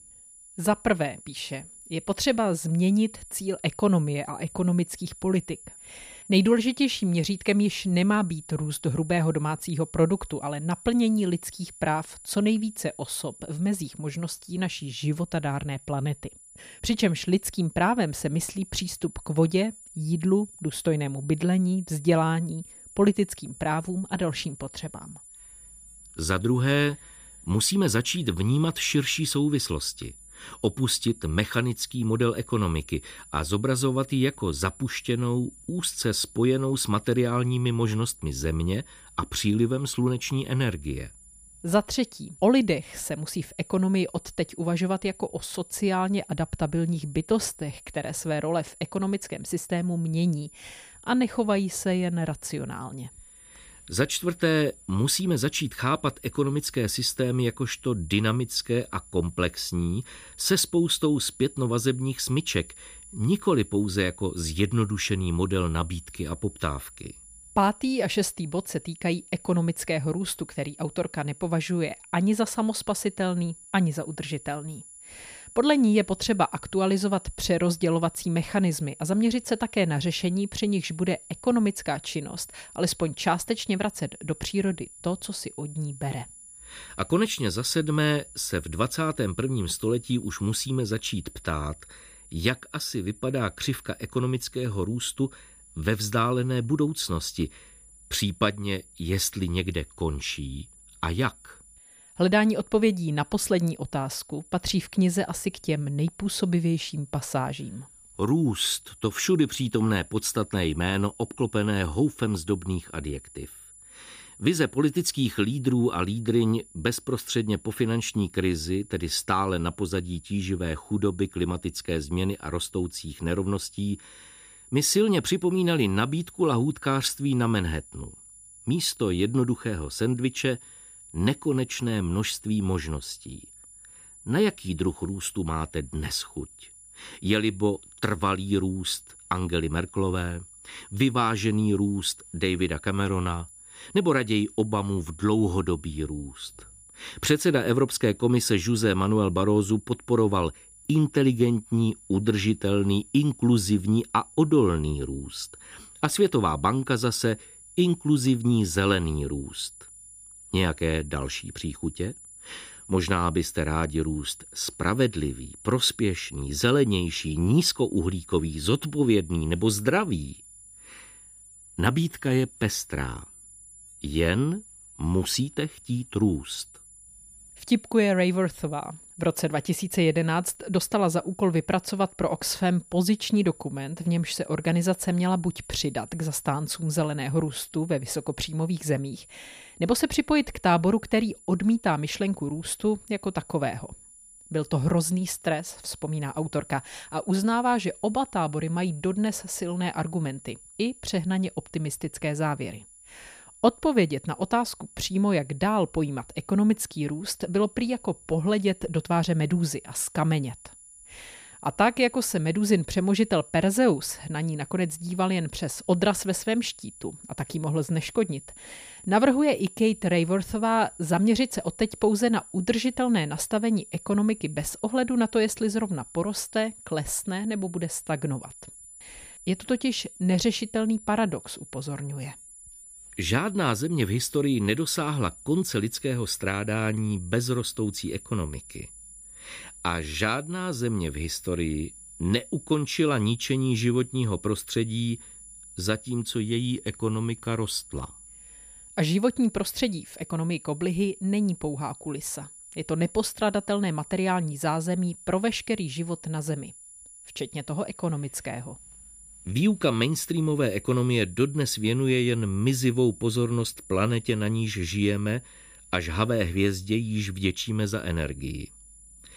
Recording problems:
high-pitched whine; noticeable; throughout; 10 kHz, 20 dB below the speech

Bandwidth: 15 kHz